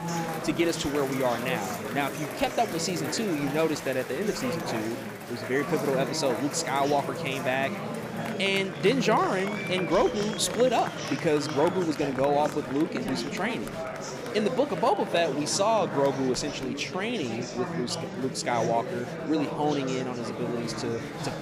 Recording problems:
murmuring crowd; loud; throughout; 6 dB below the speech

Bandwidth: 15 kHz